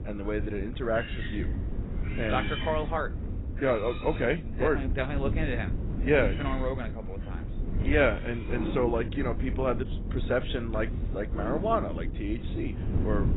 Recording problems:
garbled, watery; badly; nothing above 4 kHz
animal sounds; loud; throughout; 9 dB below the speech
wind noise on the microphone; occasional gusts; 15 dB below the speech

